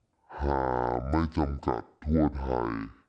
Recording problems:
wrong speed and pitch; too slow and too low; 0.6 times normal speed

